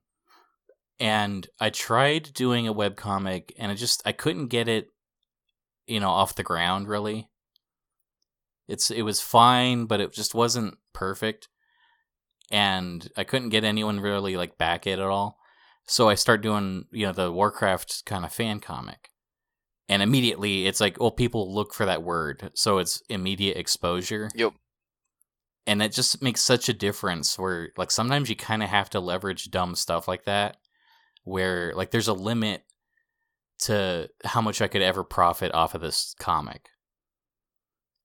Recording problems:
none

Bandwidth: 17.5 kHz